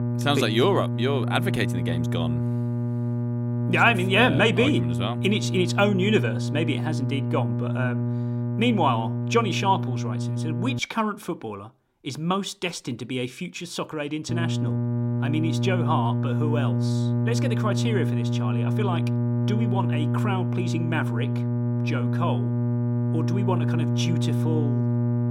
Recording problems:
electrical hum; loud; until 11 s and from 14 s on; 60 Hz, 7 dB below the speech

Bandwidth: 16 kHz